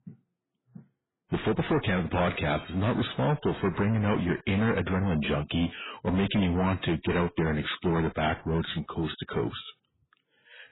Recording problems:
distortion; heavy; 7 dB below the speech
garbled, watery; badly; nothing above 4 kHz

